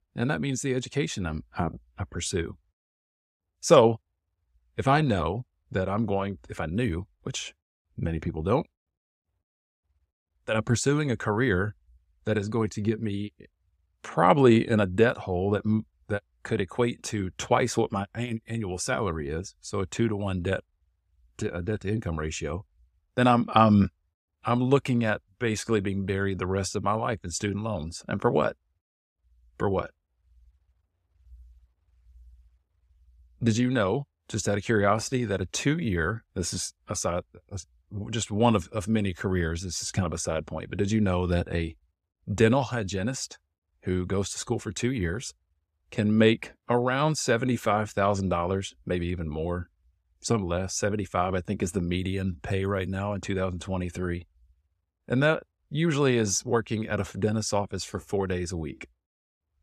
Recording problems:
none

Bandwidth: 14.5 kHz